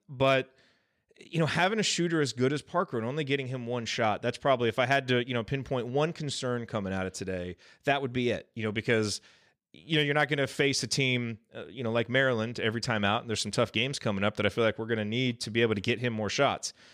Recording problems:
none

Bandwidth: 15 kHz